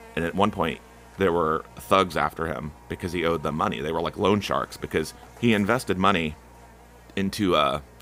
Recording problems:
electrical hum; faint; throughout; 60 Hz, 25 dB below the speech

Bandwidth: 15.5 kHz